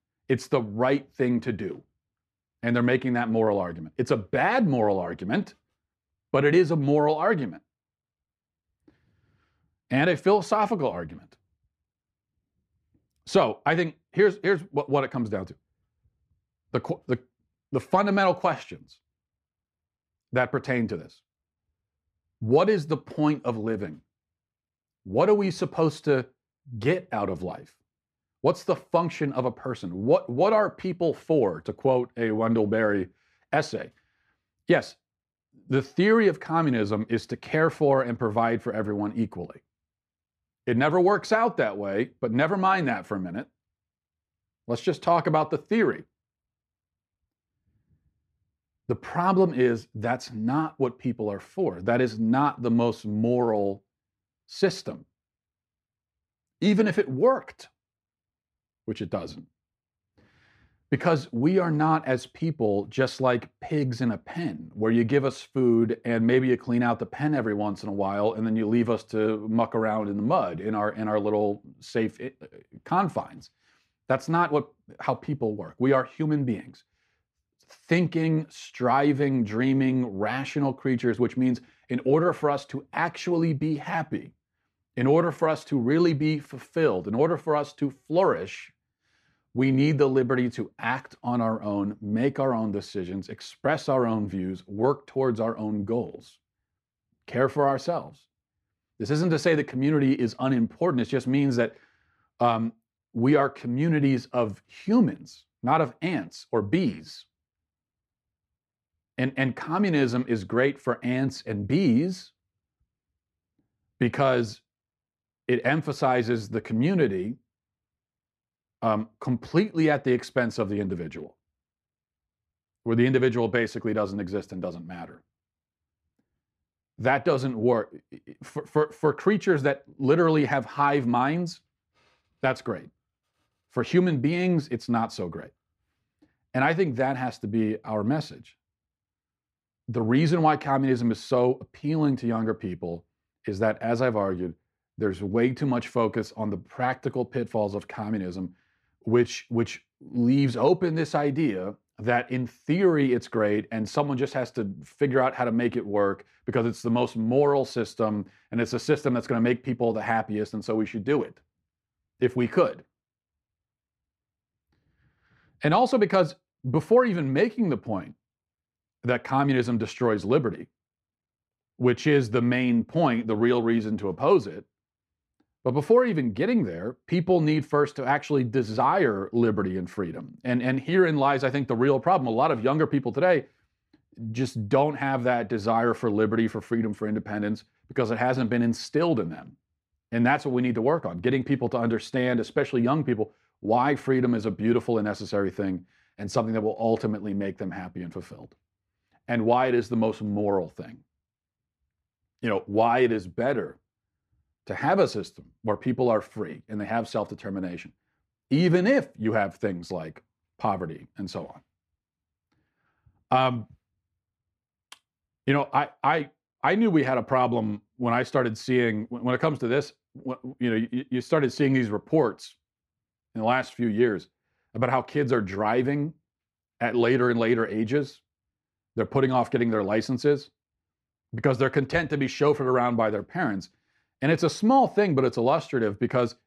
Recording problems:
muffled; slightly; fading above 4 kHz

